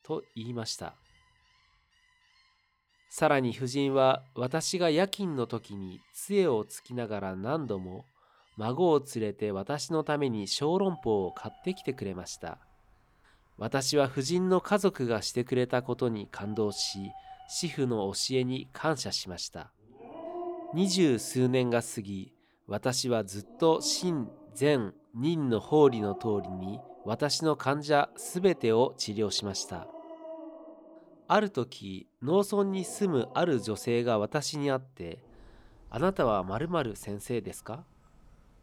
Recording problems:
animal sounds; noticeable; throughout; 20 dB below the speech

